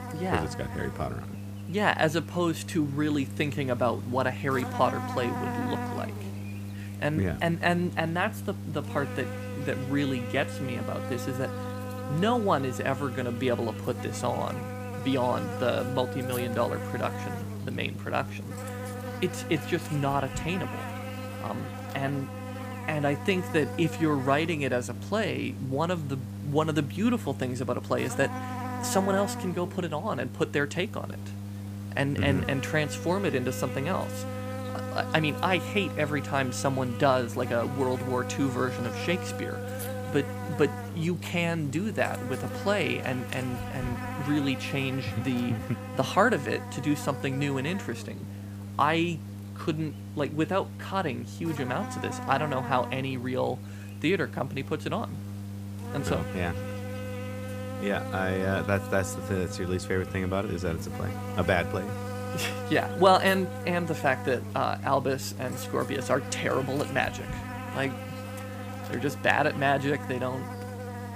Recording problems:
electrical hum; loud; throughout; 50 Hz, 10 dB below the speech
animal sounds; faint; throughout; 30 dB below the speech

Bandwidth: 15 kHz